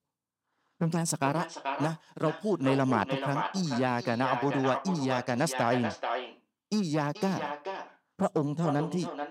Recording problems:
echo of what is said; strong; throughout; 430 ms later, 7 dB below the speech

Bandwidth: 16 kHz